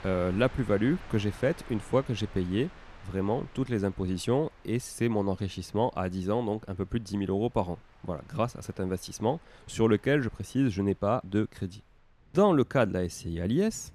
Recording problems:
train or aircraft noise; faint; throughout; 25 dB below the speech

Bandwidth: 14 kHz